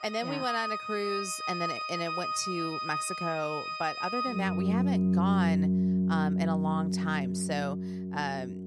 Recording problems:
background music; very loud; throughout; 4 dB above the speech

